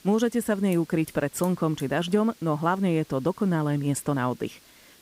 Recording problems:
hiss; faint; throughout; 25 dB below the speech

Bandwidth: 15.5 kHz